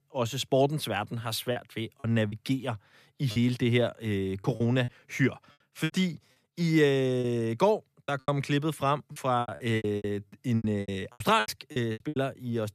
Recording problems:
choppy; very; 13% of the speech affected

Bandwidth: 14.5 kHz